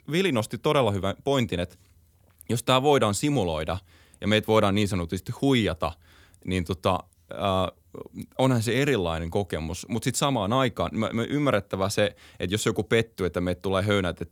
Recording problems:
none

